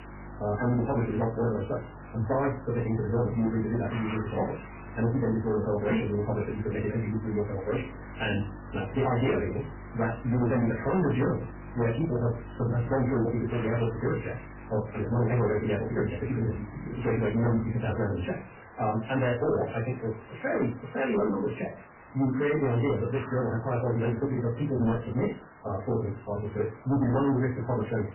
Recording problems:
off-mic speech; far
garbled, watery; badly; nothing above 3 kHz
wrong speed, natural pitch; too fast; 1.8 times normal speed
distortion; slight; 10% of the sound clipped
room echo; very slight; dies away in 0.2 s
hiss; noticeable; throughout; 20 dB below the speech
electrical hum; faint; until 18 s; 50 Hz, 25 dB below the speech

